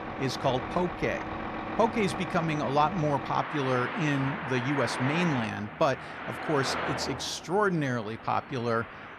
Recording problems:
traffic noise; loud; throughout; 6 dB below the speech

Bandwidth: 14 kHz